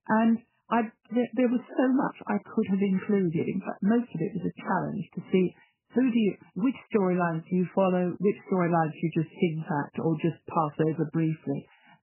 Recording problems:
garbled, watery; badly; nothing above 3 kHz

